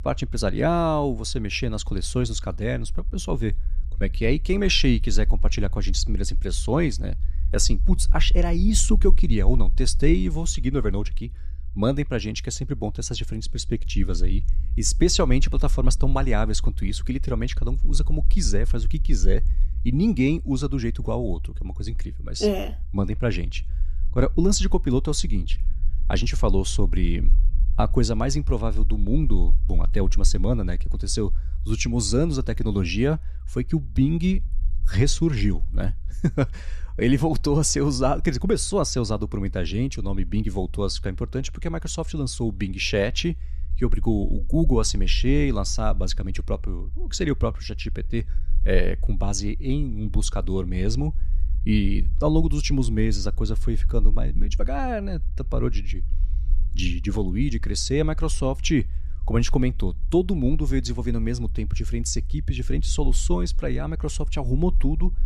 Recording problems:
low rumble; faint; throughout; 25 dB below the speech

